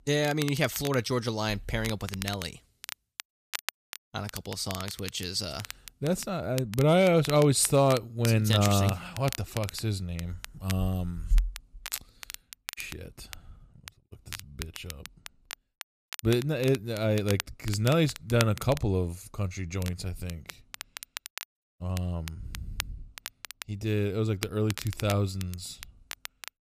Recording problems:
crackle, like an old record; noticeable; 15 dB below the speech

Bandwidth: 14.5 kHz